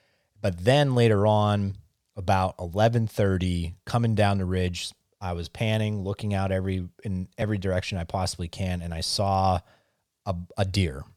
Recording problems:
none

